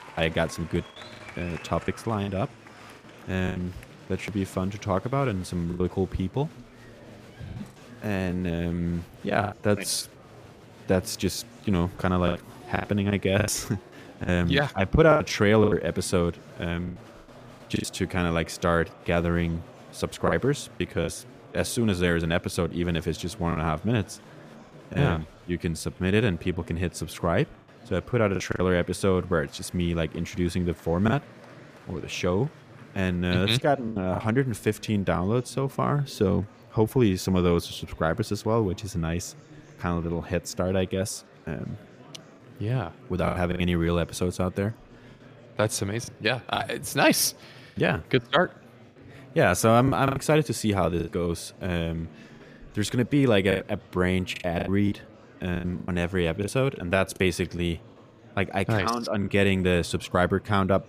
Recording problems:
murmuring crowd; faint; throughout; 20 dB below the speech
choppy; very; 5% of the speech affected

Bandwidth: 15 kHz